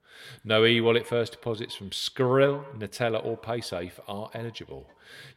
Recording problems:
echo of what is said; faint; throughout; 110 ms later, 20 dB below the speech

